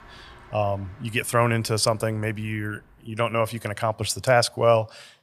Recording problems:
traffic noise; faint; until 3 s; 25 dB below the speech

